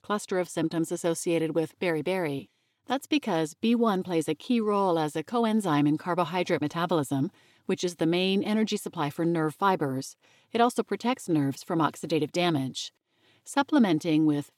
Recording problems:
none

